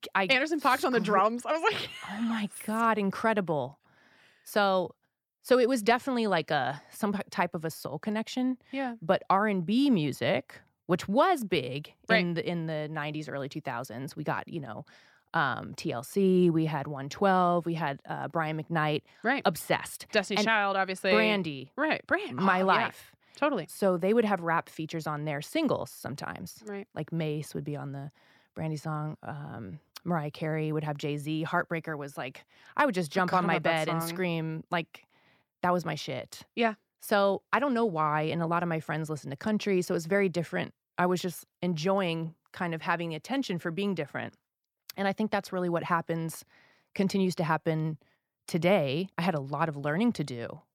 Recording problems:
none

